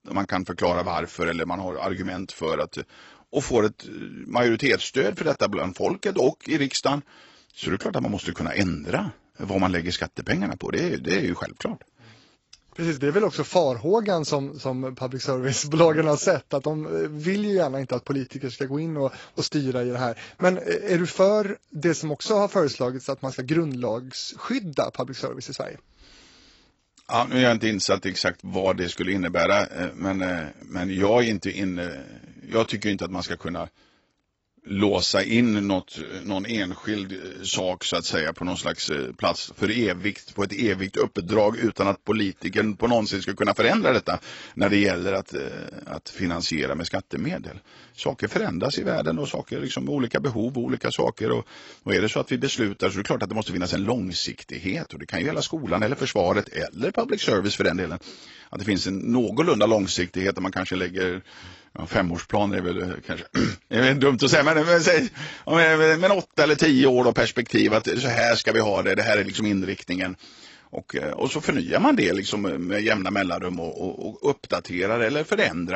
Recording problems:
garbled, watery; badly; nothing above 8 kHz
abrupt cut into speech; at the end

